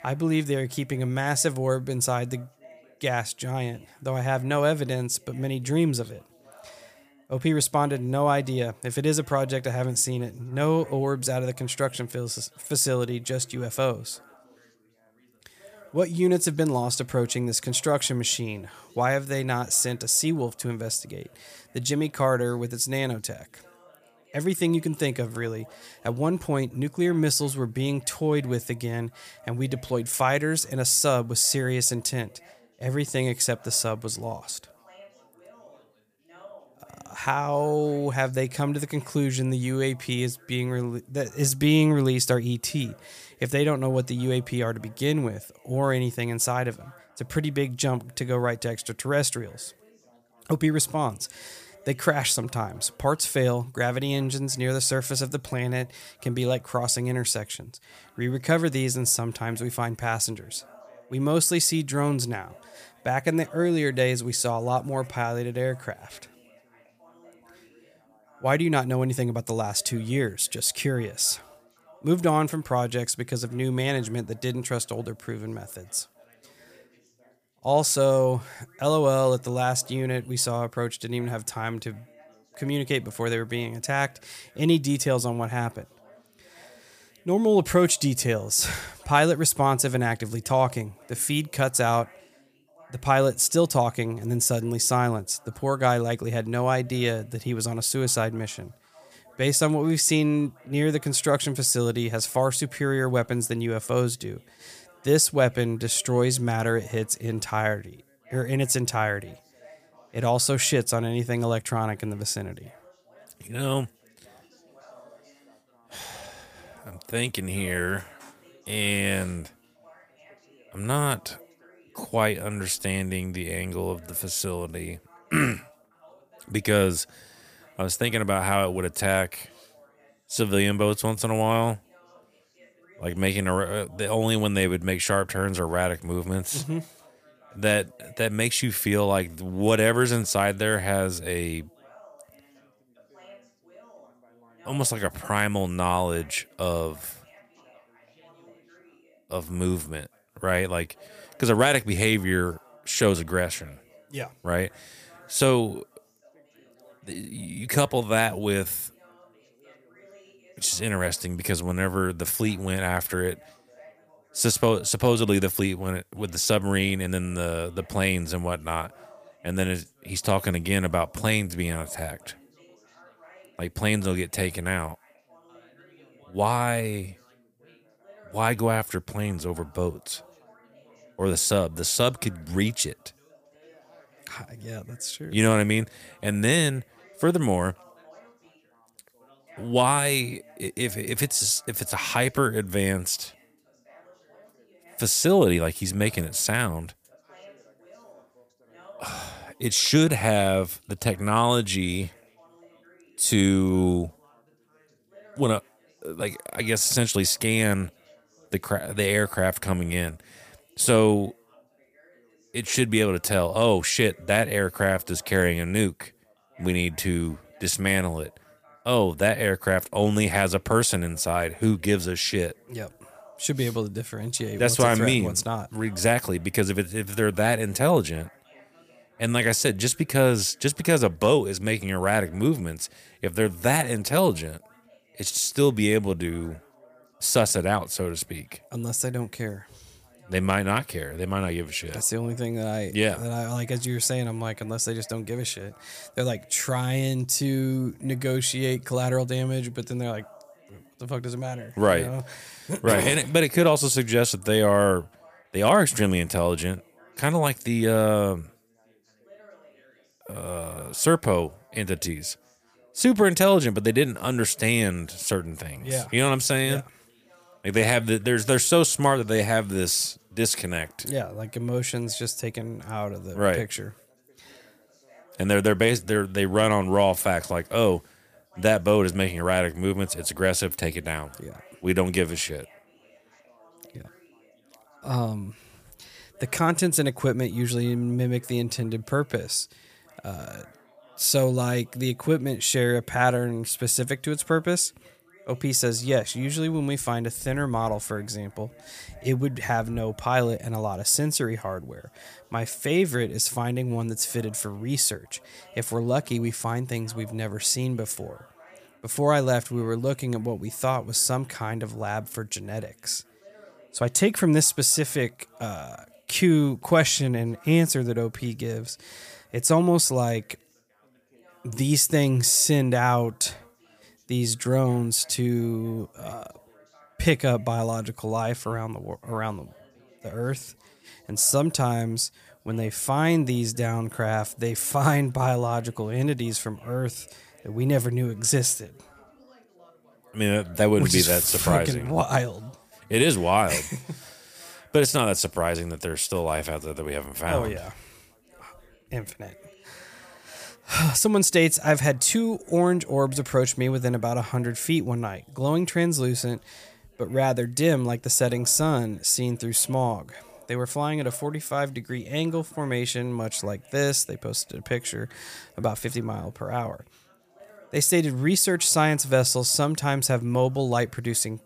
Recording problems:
background chatter; faint; throughout; 3 voices, 30 dB below the speech

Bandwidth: 15 kHz